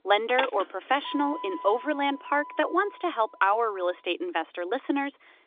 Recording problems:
phone-call audio; nothing above 3.5 kHz
traffic noise; noticeable; throughout; 10 dB below the speech

